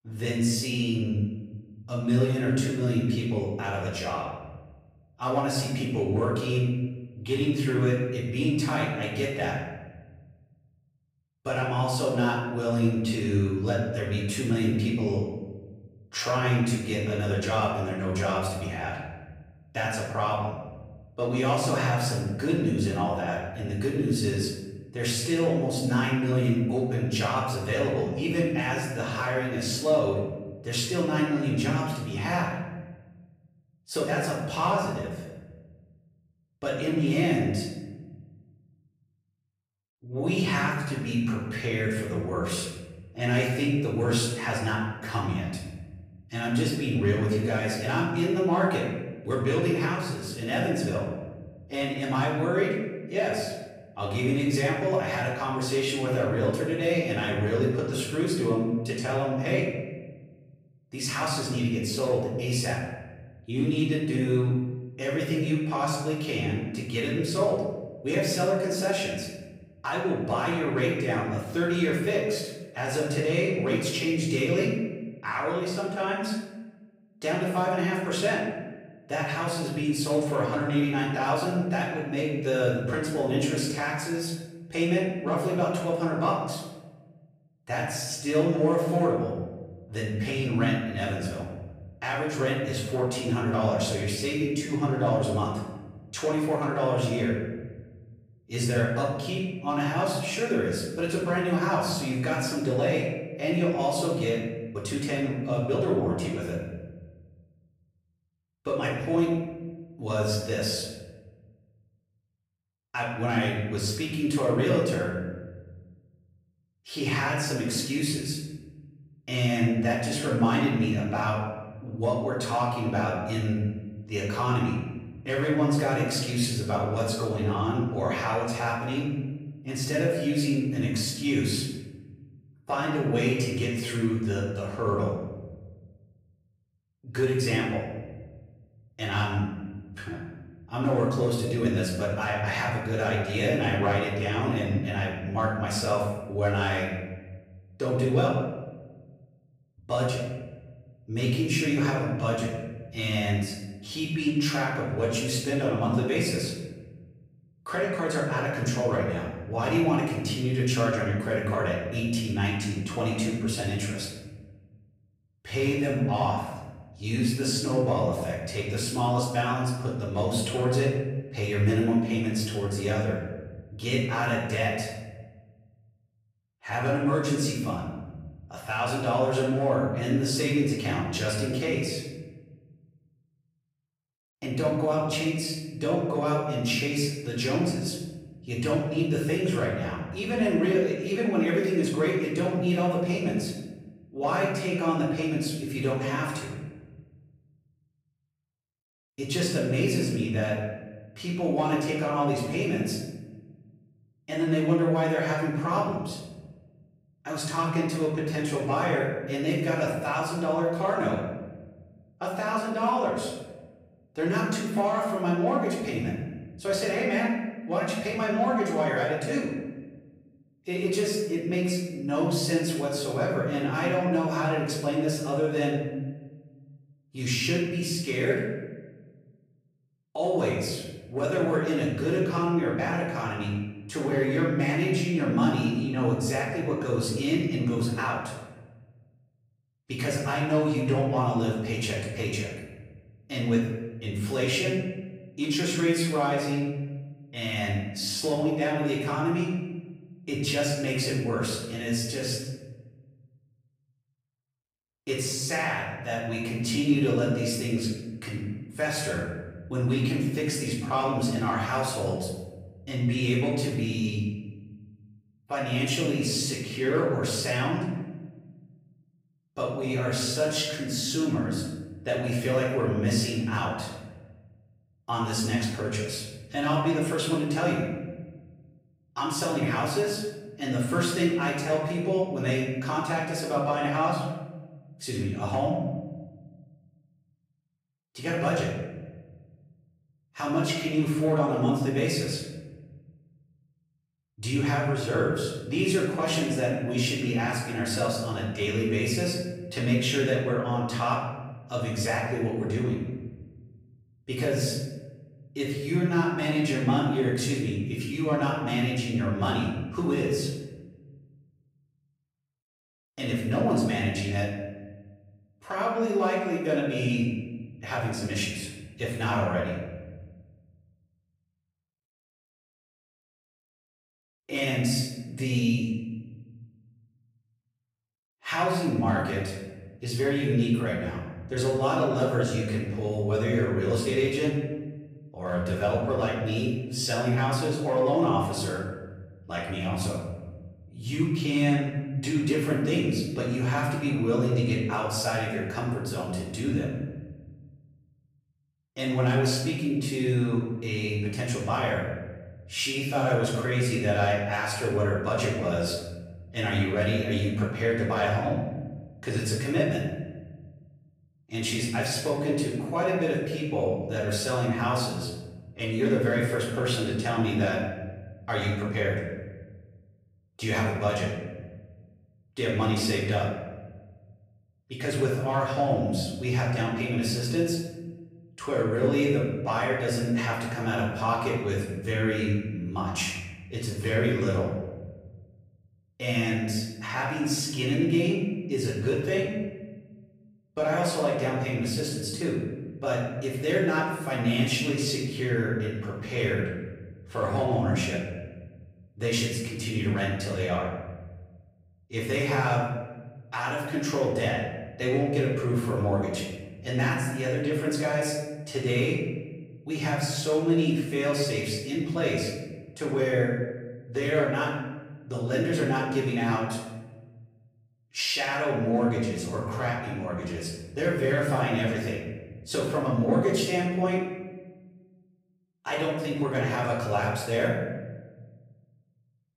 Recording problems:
off-mic speech; far
room echo; noticeable; dies away in 1.2 s

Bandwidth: 15.5 kHz